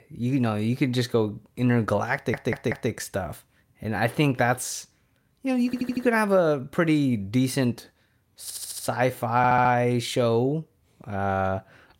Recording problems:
audio stuttering; 4 times, first at 2 s

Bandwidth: 16 kHz